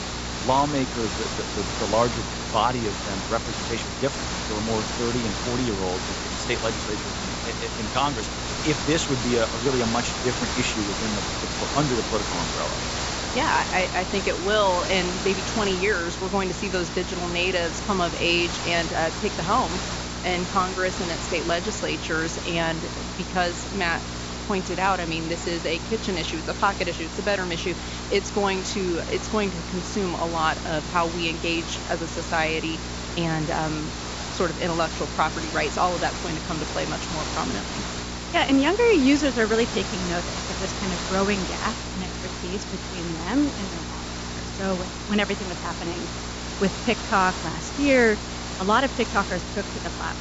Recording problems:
high frequencies cut off; noticeable; nothing above 8 kHz
hiss; loud; throughout; 5 dB below the speech
electrical hum; noticeable; throughout; 60 Hz, 20 dB below the speech

